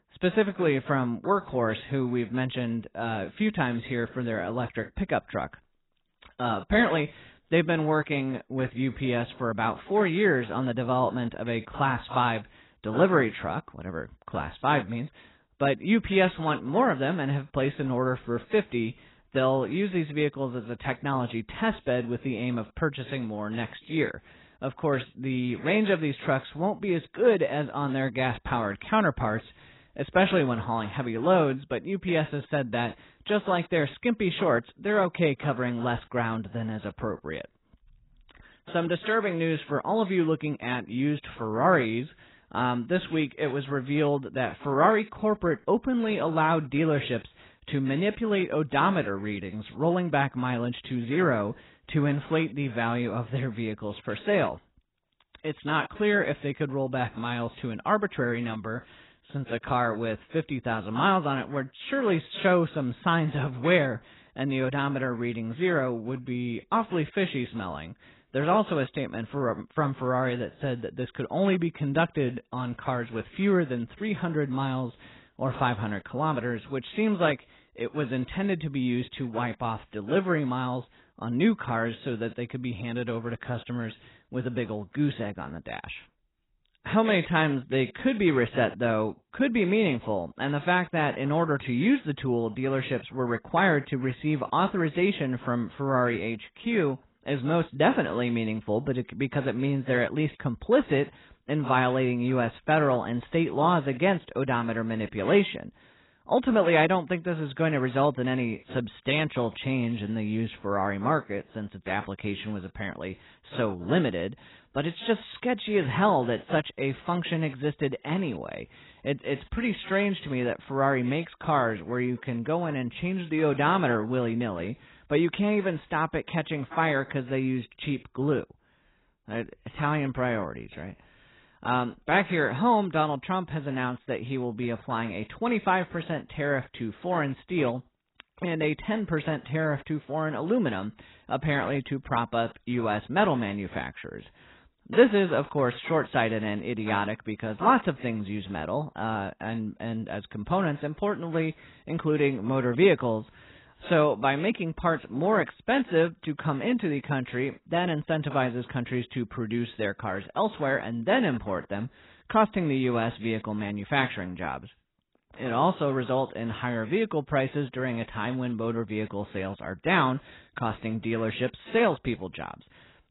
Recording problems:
garbled, watery; badly; nothing above 4 kHz

